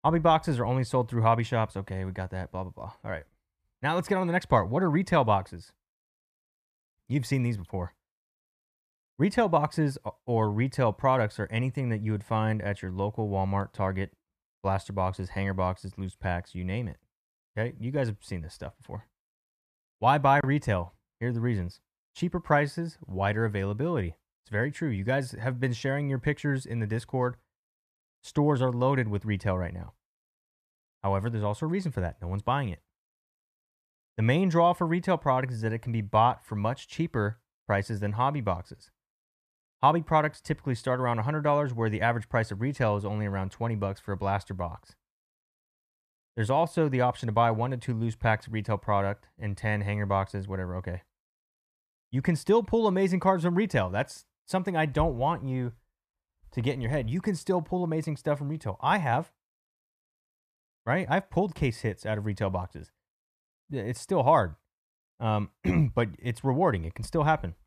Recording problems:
muffled; slightly; fading above 3 kHz

